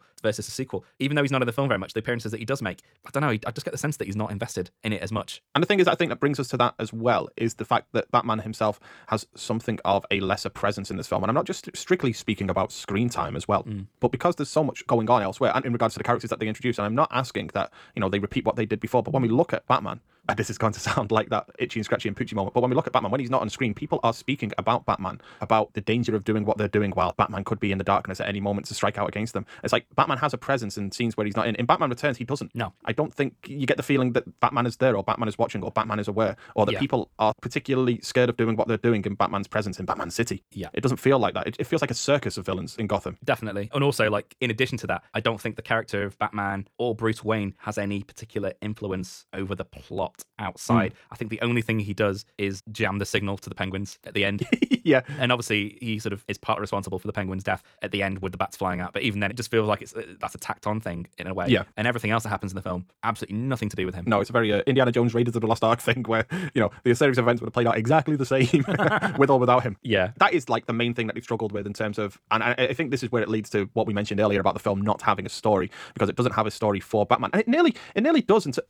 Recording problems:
wrong speed, natural pitch; too fast; 1.5 times normal speed

